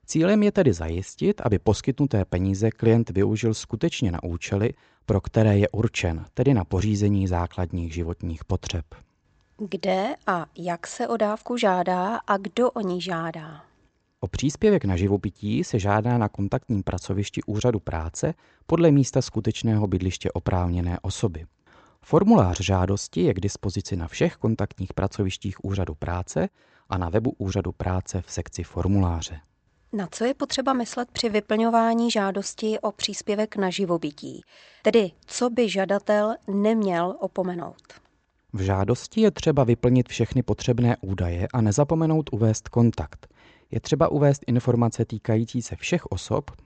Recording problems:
high frequencies cut off; noticeable; nothing above 8 kHz

